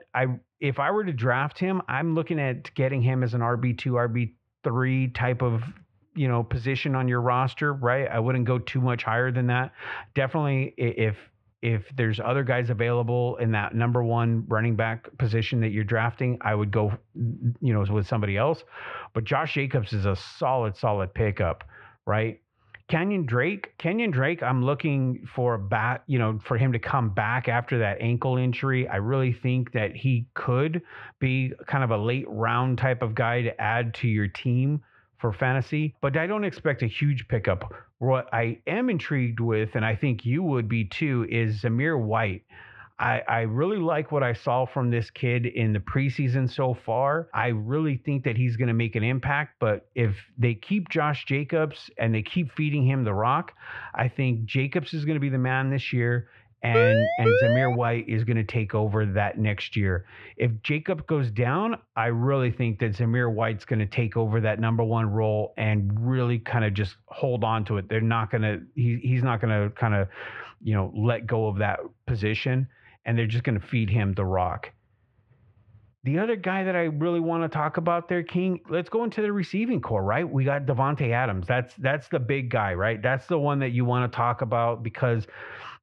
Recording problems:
muffled; very; fading above 2.5 kHz
siren; loud; from 57 to 58 s; peak 5 dB above the speech

